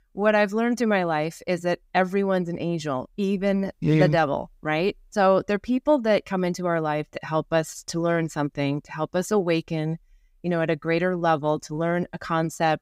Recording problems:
none

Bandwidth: 15.5 kHz